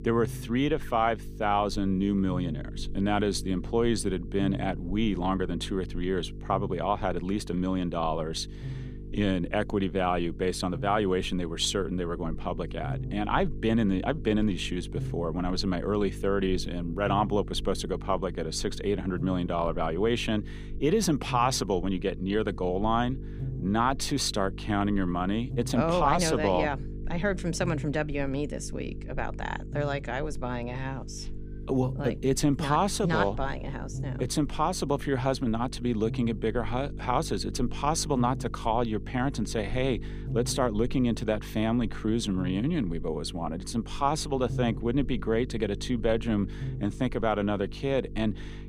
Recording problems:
electrical hum; noticeable; throughout; 50 Hz, 20 dB below the speech

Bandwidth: 15 kHz